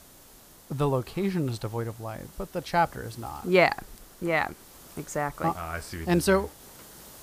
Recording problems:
hiss; faint; throughout; 20 dB below the speech

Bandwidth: 15 kHz